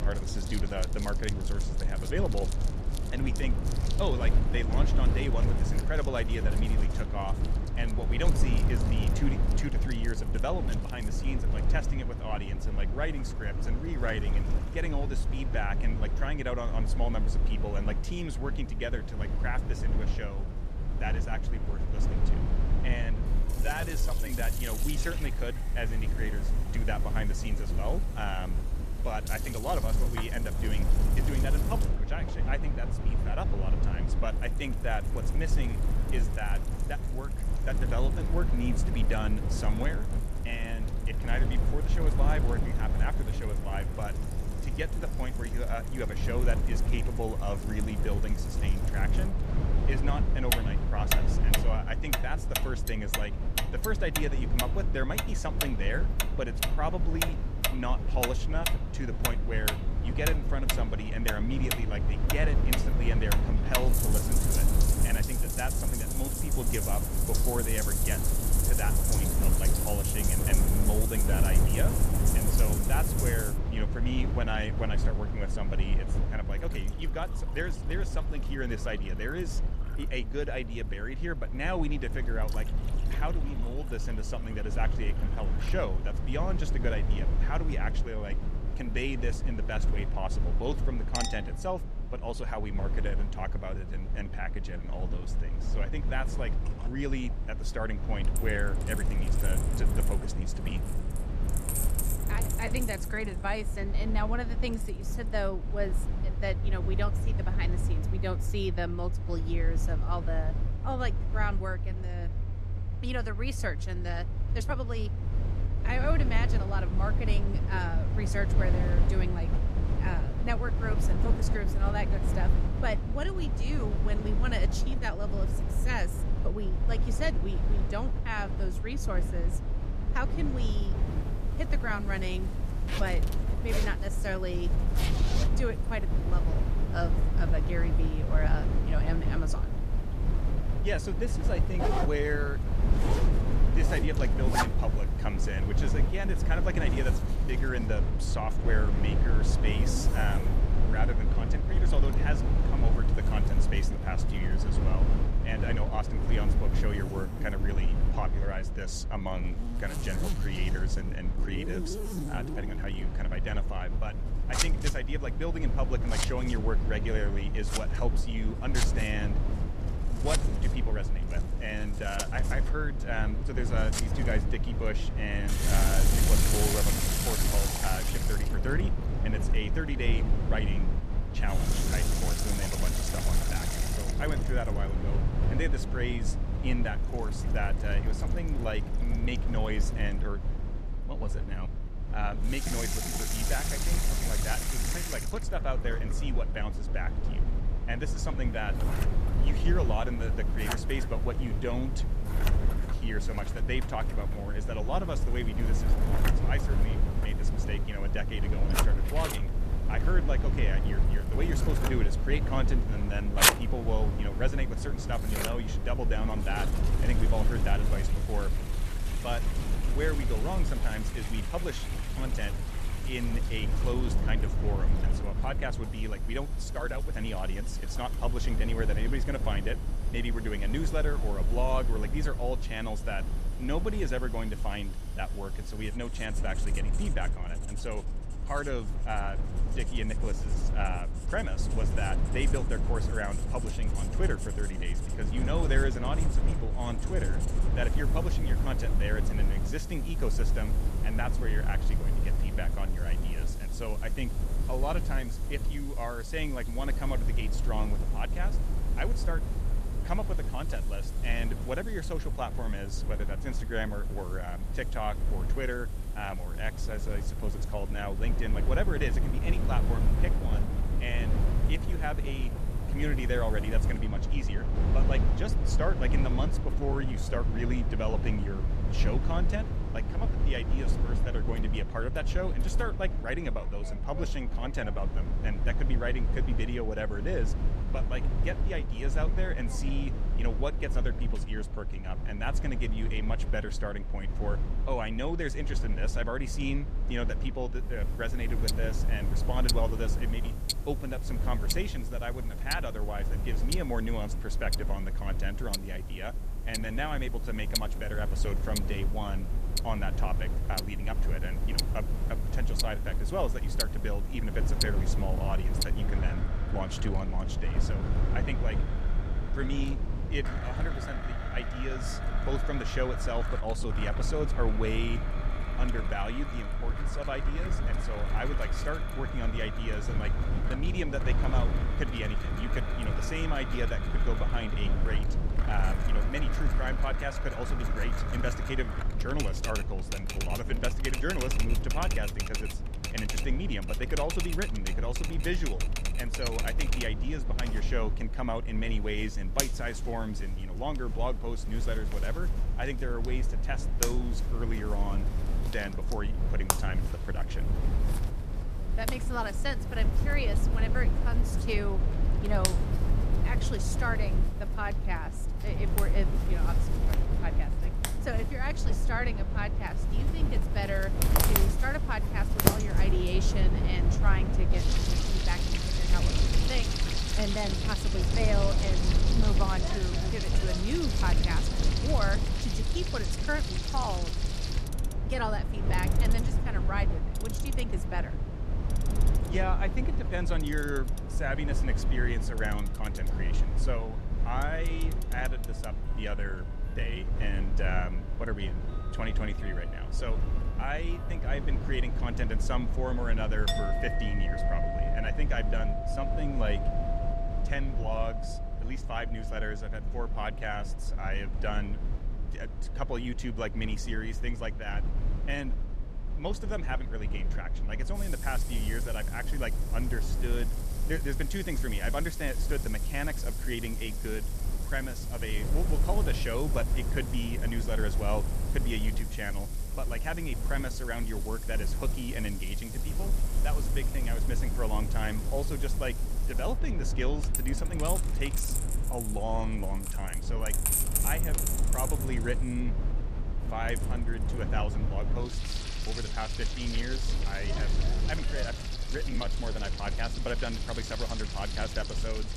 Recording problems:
household noises; loud; throughout; as loud as the speech
low rumble; loud; throughout; 7 dB below the speech
uneven, jittery; strongly; from 23 s to 7:30

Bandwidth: 14.5 kHz